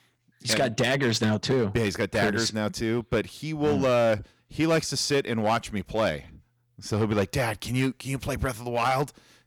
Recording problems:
distortion; slight; 6% of the sound clipped

